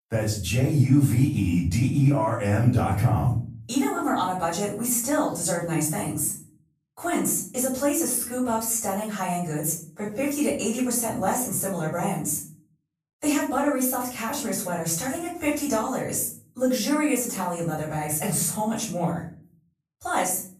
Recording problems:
off-mic speech; far
room echo; noticeable; dies away in 0.4 s

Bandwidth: 14.5 kHz